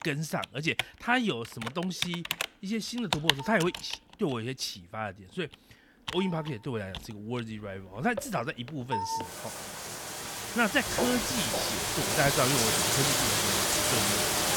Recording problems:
household noises; very loud; throughout; 3 dB above the speech
footsteps; noticeable; from 11 to 12 s; peak 2 dB below the speech

